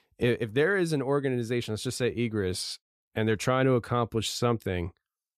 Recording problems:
none

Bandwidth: 14.5 kHz